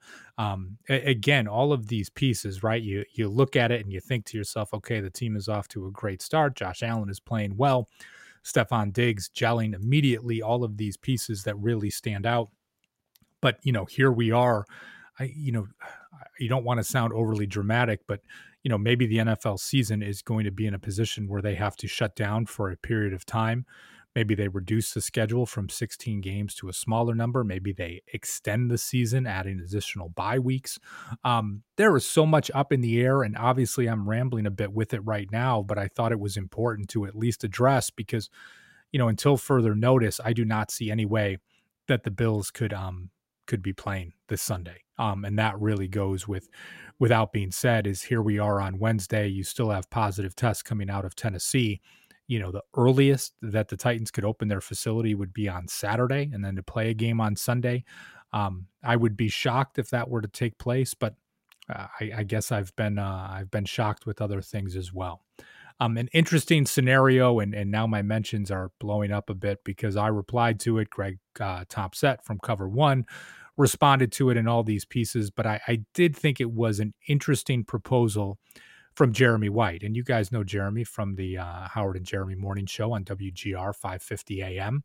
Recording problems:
none

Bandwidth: 16 kHz